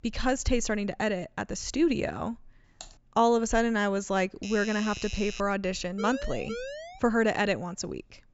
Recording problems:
high frequencies cut off; noticeable; nothing above 8 kHz
keyboard typing; faint; at 3 s; peak 20 dB below the speech
doorbell; noticeable; from 4.5 to 5.5 s; peak 10 dB below the speech
siren; noticeable; from 6 to 7 s; peak 9 dB below the speech

